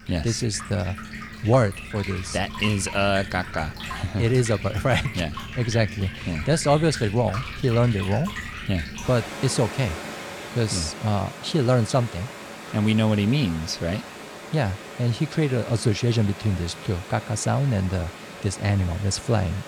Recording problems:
rain or running water; noticeable; throughout; 10 dB below the speech

